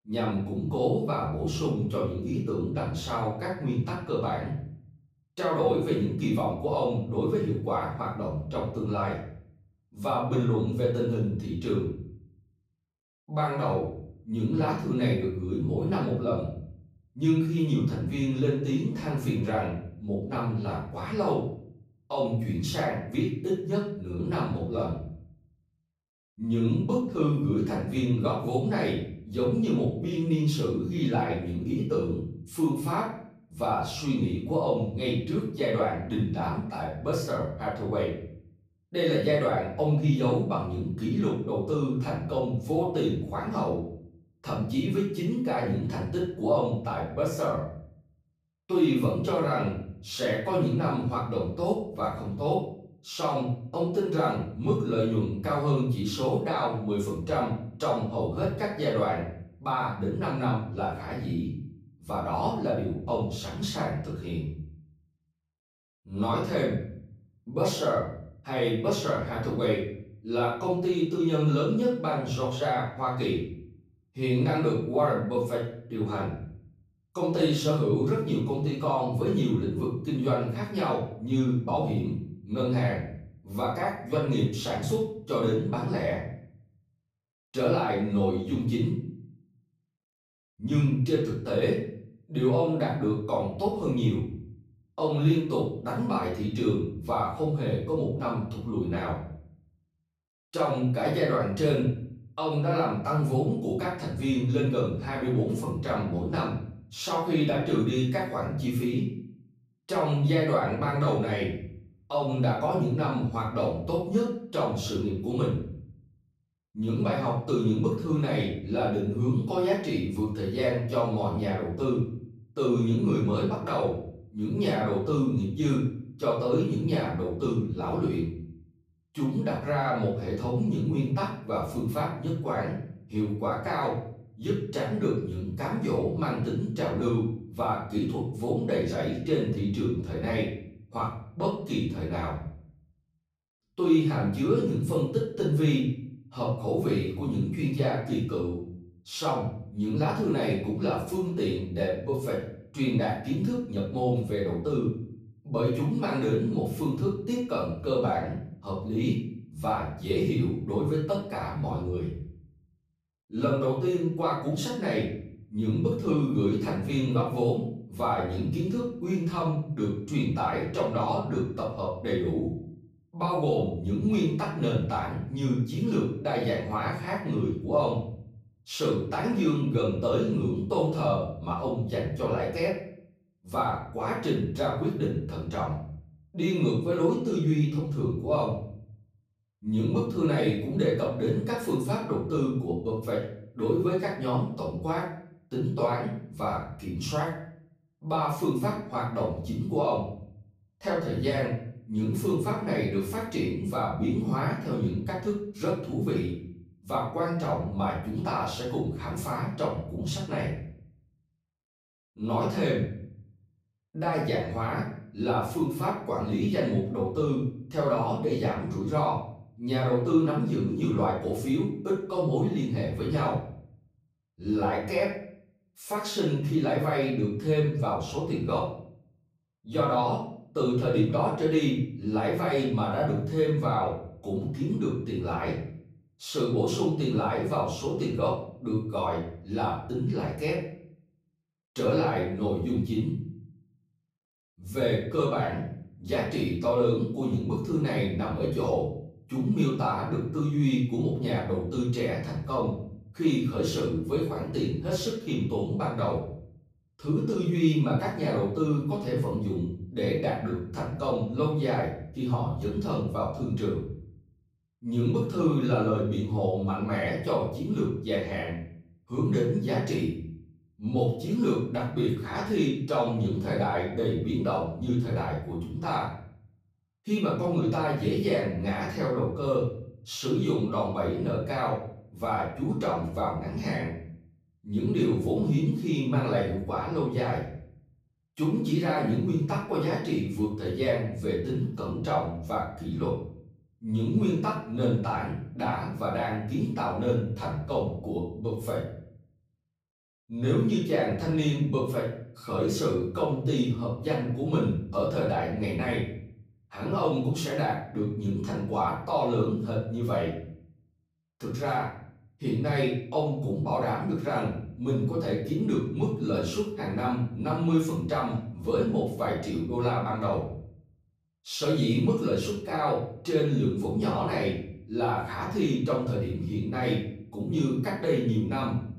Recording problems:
off-mic speech; far
room echo; noticeable; dies away in 0.6 s

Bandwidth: 15 kHz